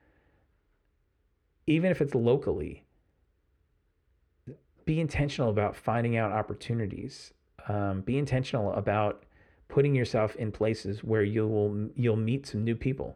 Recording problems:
muffled; slightly; fading above 4 kHz

